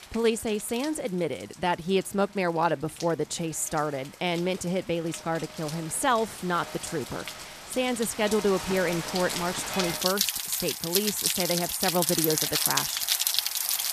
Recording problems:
rain or running water; very loud; throughout; 1 dB above the speech

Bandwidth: 14.5 kHz